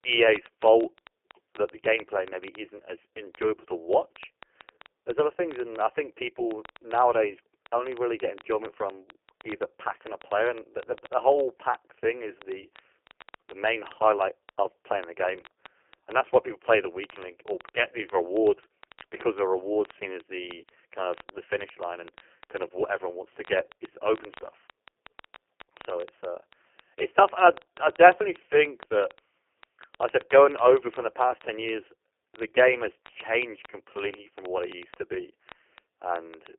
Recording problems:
phone-call audio; poor line; nothing above 3 kHz
crackle, like an old record; faint; 25 dB below the speech

